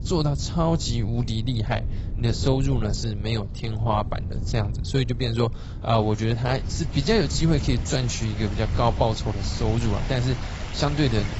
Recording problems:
garbled, watery; badly; nothing above 8 kHz
rain or running water; noticeable; throughout; 15 dB below the speech
wind noise on the microphone; occasional gusts; 20 dB below the speech

